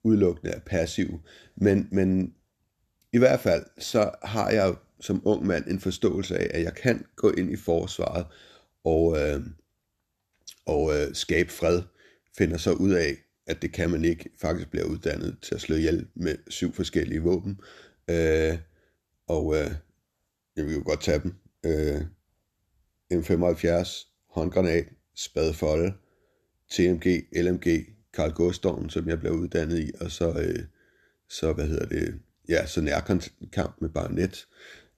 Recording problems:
none

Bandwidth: 13.5 kHz